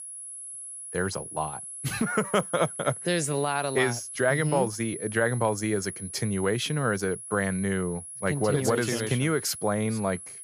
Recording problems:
high-pitched whine; loud; throughout; 10.5 kHz, 9 dB below the speech

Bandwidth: 15 kHz